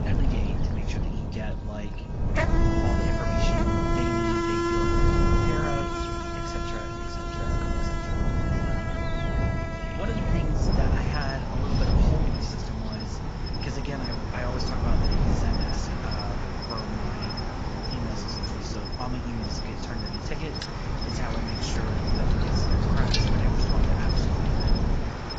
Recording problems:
garbled, watery; badly
animal sounds; very loud; throughout; 4 dB above the speech
wind noise on the microphone; heavy; 1 dB above the speech

